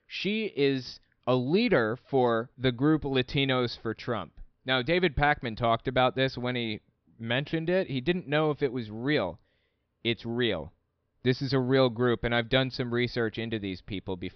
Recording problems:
high frequencies cut off; noticeable; nothing above 5.5 kHz

